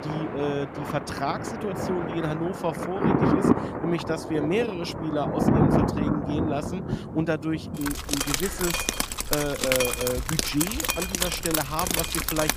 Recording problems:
rain or running water; very loud; throughout; 3 dB above the speech

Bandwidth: 15 kHz